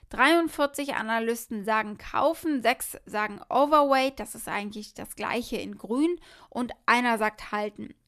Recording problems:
none

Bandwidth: 14.5 kHz